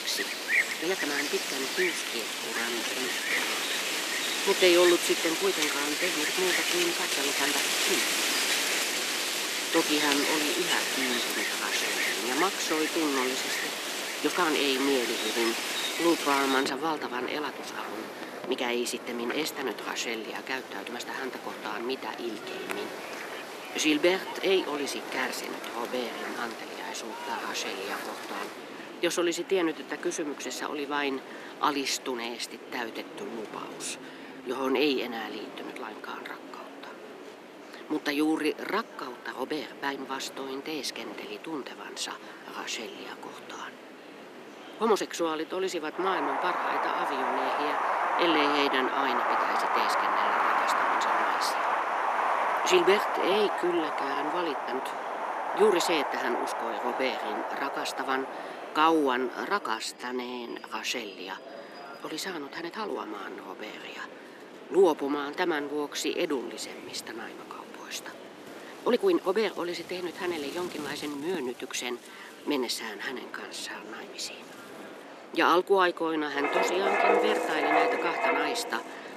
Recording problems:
thin; somewhat; fading below 300 Hz
wind in the background; very loud; throughout; 2 dB above the speech
chatter from many people; noticeable; throughout; 15 dB below the speech
uneven, jittery; strongly; from 1 s to 1:14

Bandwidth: 14.5 kHz